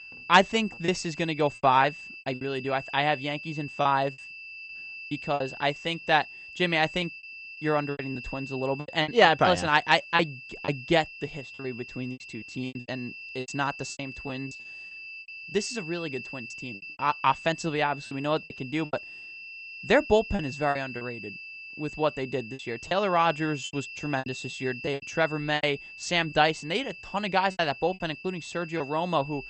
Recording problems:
garbled, watery; slightly; nothing above 8 kHz
high-pitched whine; noticeable; throughout; 2.5 kHz, 15 dB below the speech
choppy; very; 10% of the speech affected

